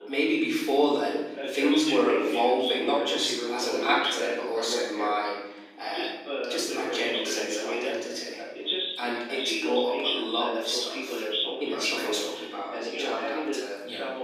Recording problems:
off-mic speech; far
room echo; noticeable; dies away in 1.1 s
thin; very slightly; fading below 250 Hz
voice in the background; loud; throughout; 3 dB below the speech

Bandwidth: 15.5 kHz